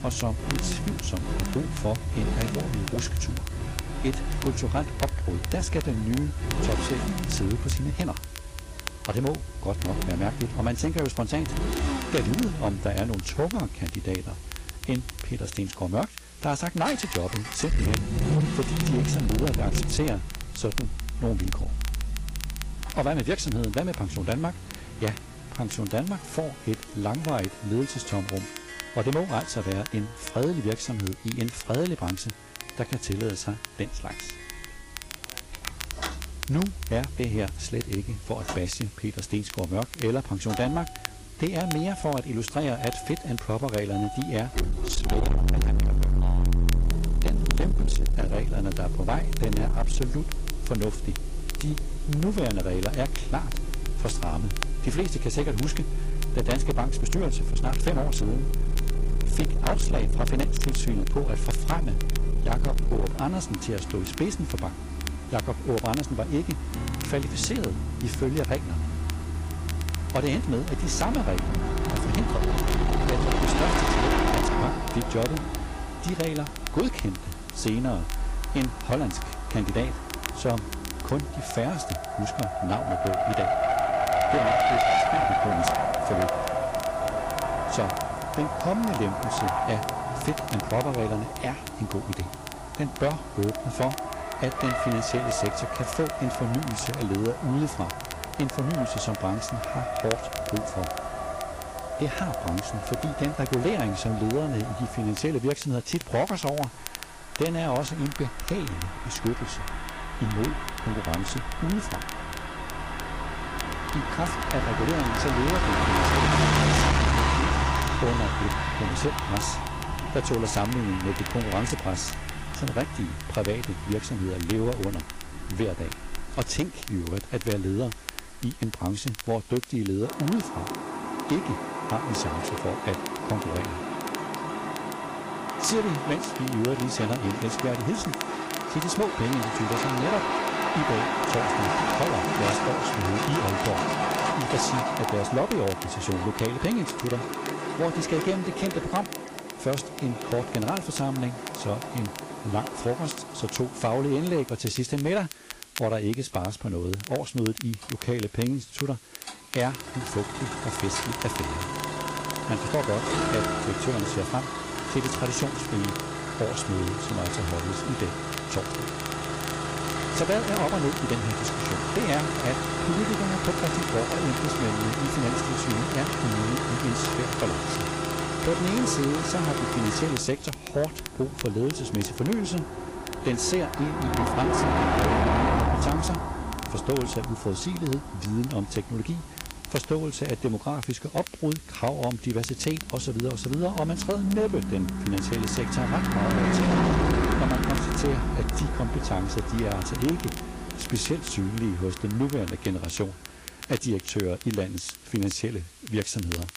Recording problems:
distortion; heavy; 8% of the sound clipped
garbled, watery; slightly; nothing above 11 kHz
traffic noise; loud; throughout; as loud as the speech
crackle, like an old record; noticeable; 10 dB below the speech
background music; faint; throughout; 20 dB below the speech
hiss; faint; throughout; 20 dB below the speech

